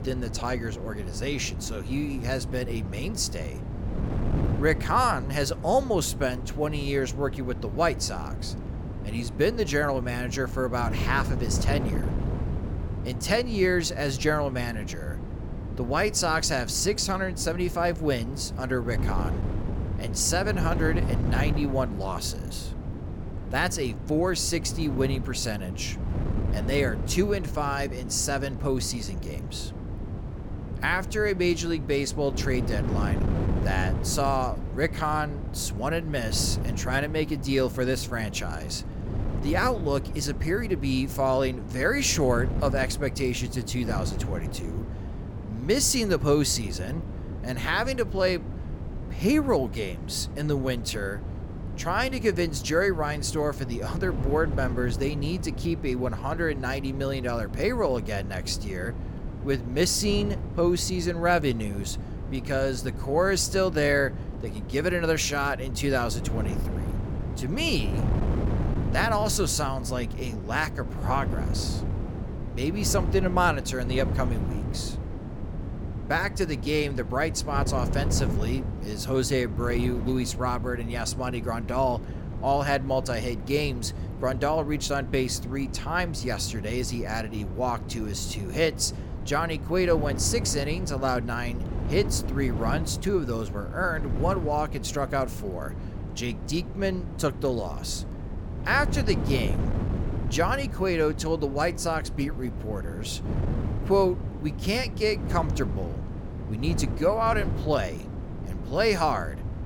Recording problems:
wind noise on the microphone; occasional gusts; 15 dB below the speech

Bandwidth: 18 kHz